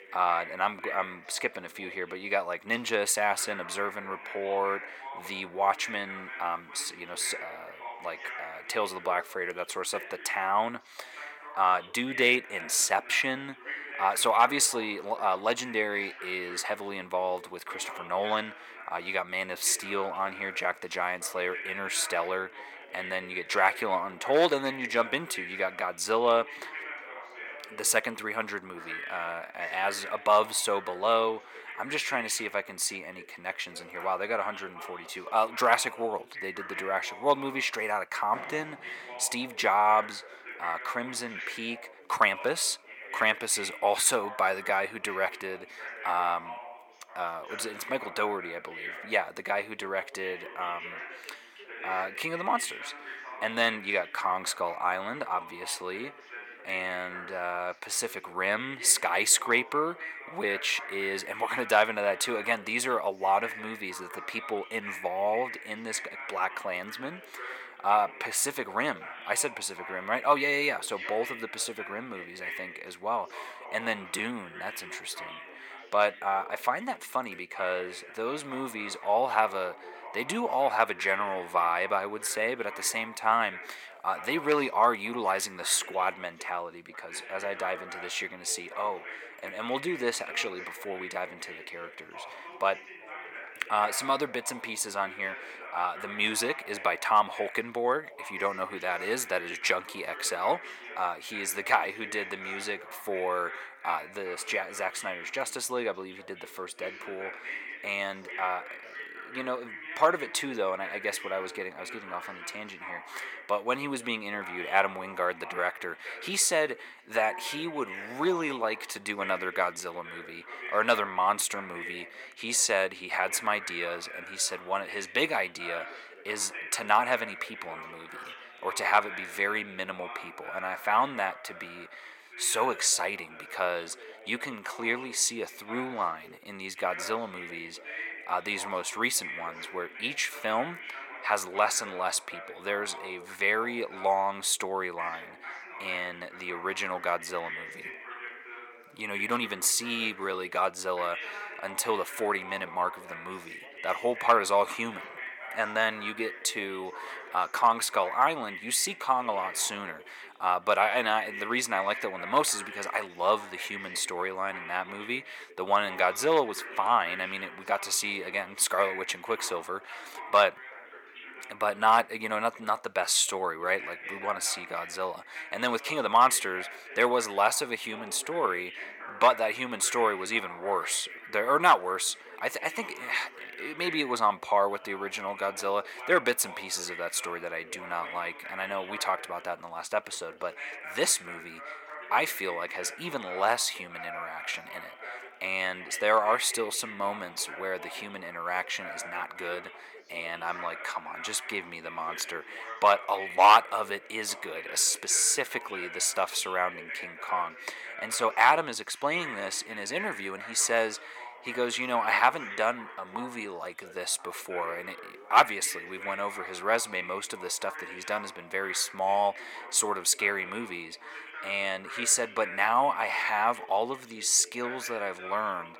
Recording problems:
thin; very; fading below 550 Hz
background chatter; noticeable; throughout; 3 voices, 15 dB below the speech
door banging; faint; at 38 s; peak 15 dB below the speech

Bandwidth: 17 kHz